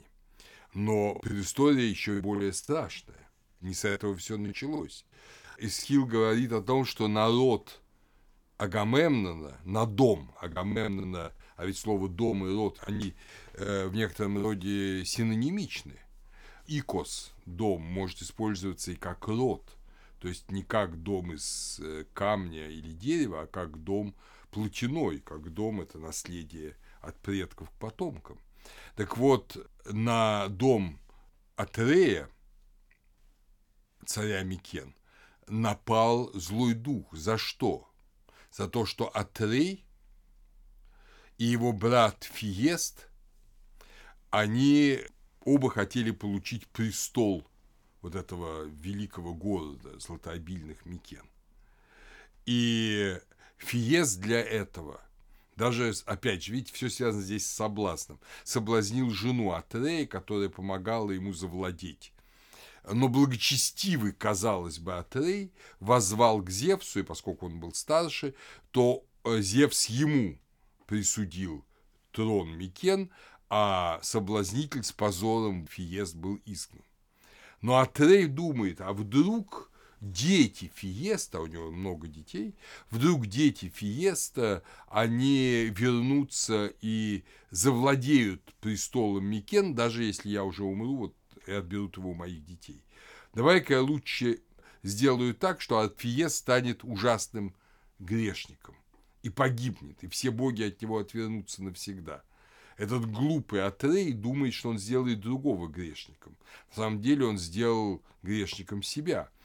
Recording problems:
choppy; very; from 1.5 to 6 s and from 11 to 14 s; 11% of the speech affected

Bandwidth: 18.5 kHz